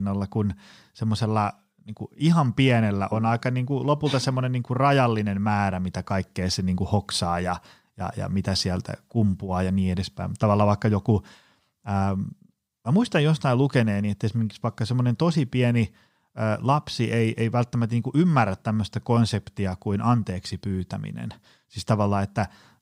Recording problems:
abrupt cut into speech; at the start

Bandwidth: 15.5 kHz